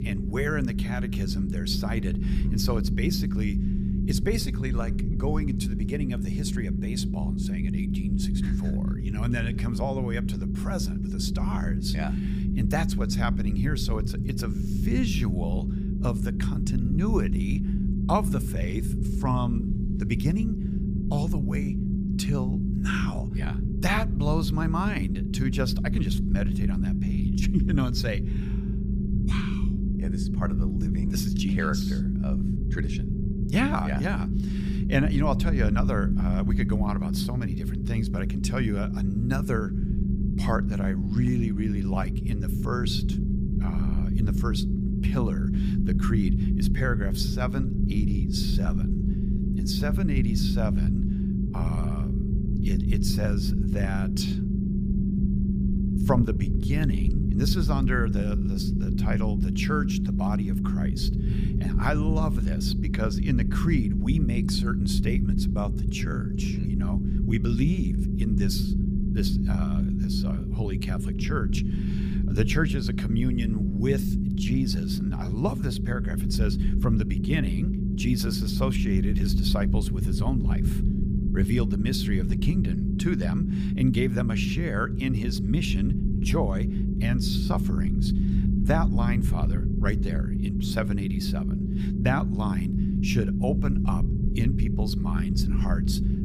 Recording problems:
low rumble; loud; throughout; 3 dB below the speech

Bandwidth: 15 kHz